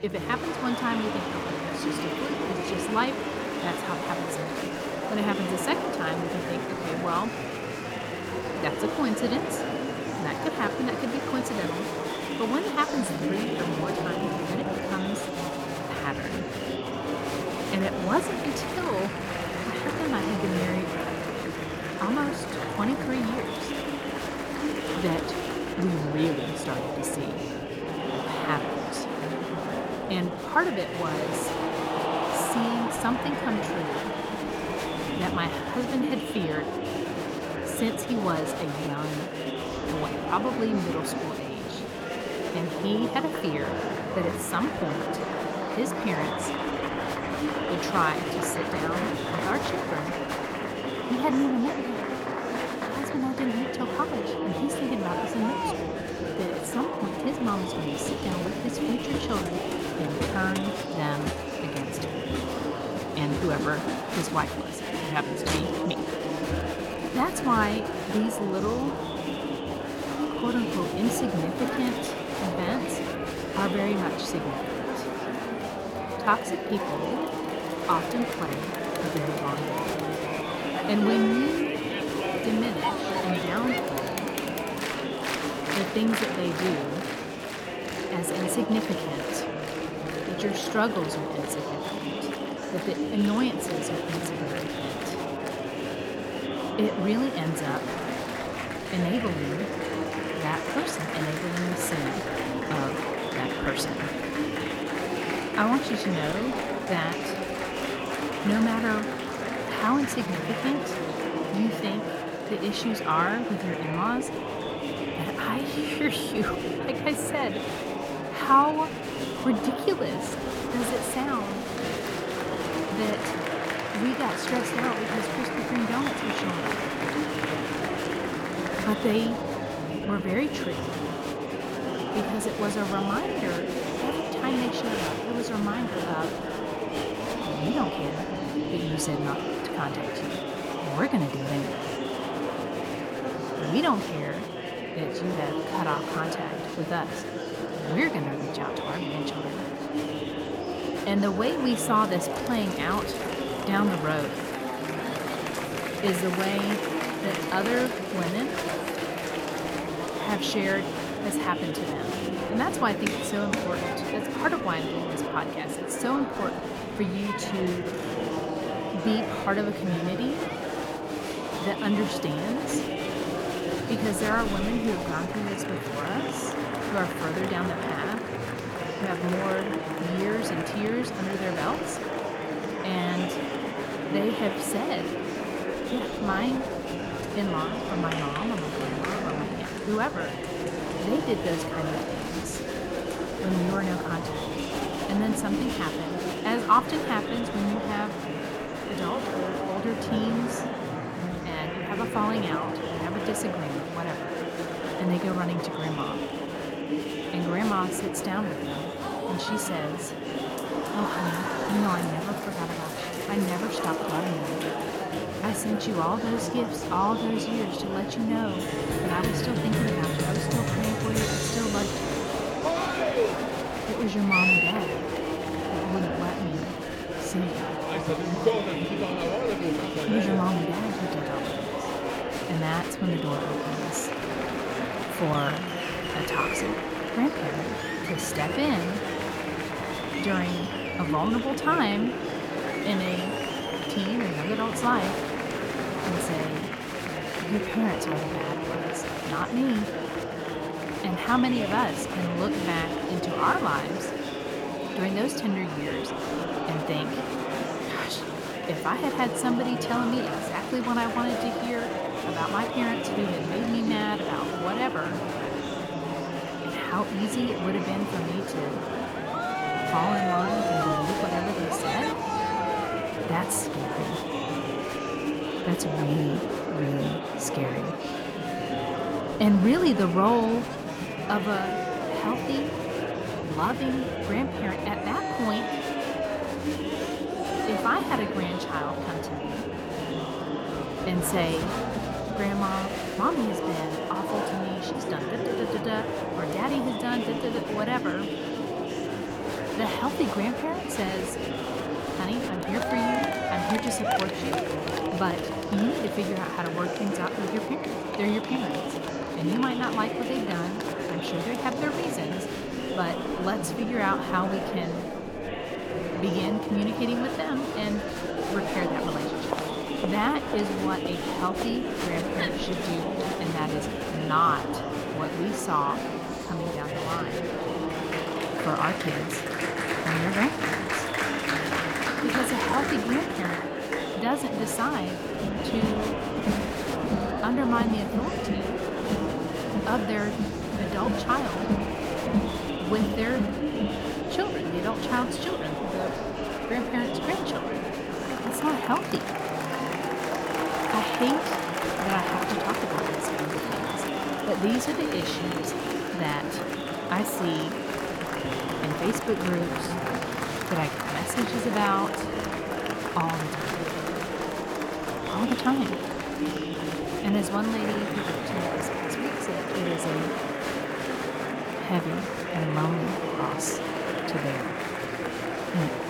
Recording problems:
murmuring crowd; loud; throughout; as loud as the speech

